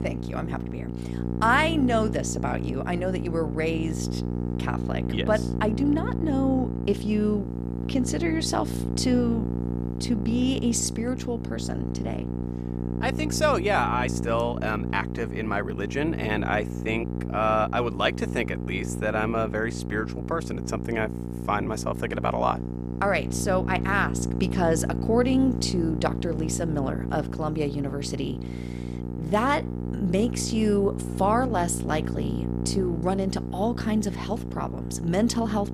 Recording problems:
electrical hum; loud; throughout; 60 Hz, 10 dB below the speech

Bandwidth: 14.5 kHz